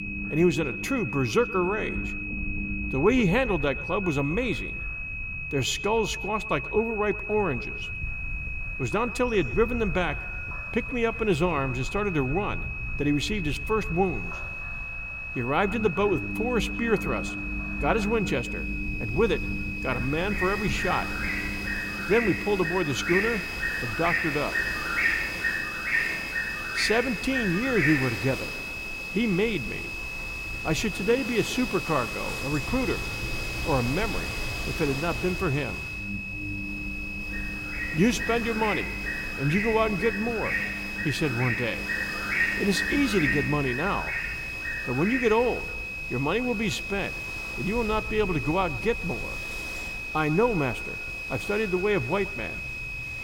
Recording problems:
echo of what is said; faint; throughout; 120 ms later, 20 dB below the speech
high-pitched whine; loud; throughout; 2.5 kHz, 6 dB below the speech
animal sounds; loud; throughout; 4 dB below the speech
low rumble; noticeable; throughout; 20 dB below the speech

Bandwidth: 16.5 kHz